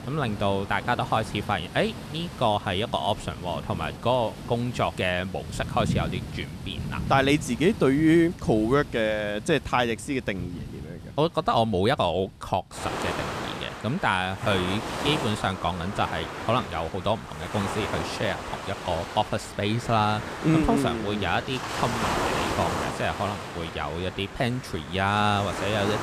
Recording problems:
rain or running water; loud; throughout; 8 dB below the speech

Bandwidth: 14.5 kHz